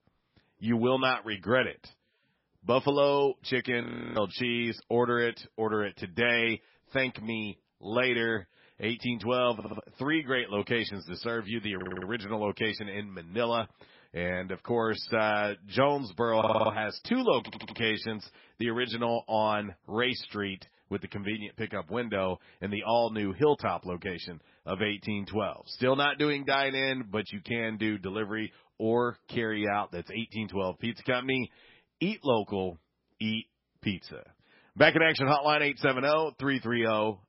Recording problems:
garbled, watery; badly; nothing above 5.5 kHz
audio freezing; at 4 s
audio stuttering; 4 times, first at 9.5 s

